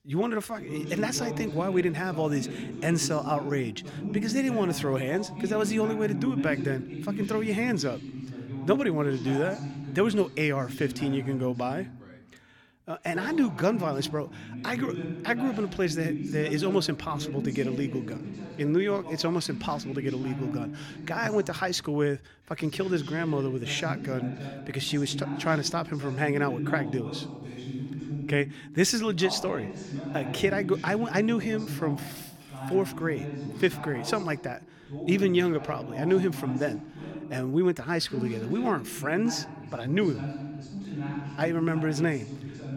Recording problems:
voice in the background; loud; throughout; 8 dB below the speech

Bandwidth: 18 kHz